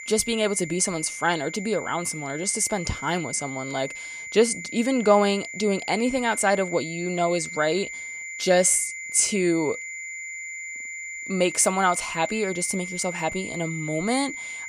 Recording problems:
high-pitched whine; loud; throughout; 2 kHz, 9 dB below the speech

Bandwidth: 15 kHz